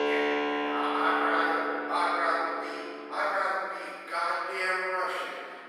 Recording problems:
room echo; strong; dies away in 2.4 s
off-mic speech; far
thin; very; fading below 350 Hz
background music; loud; until 3.5 s; 3 dB below the speech
voice in the background; faint; throughout; 30 dB below the speech

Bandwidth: 15.5 kHz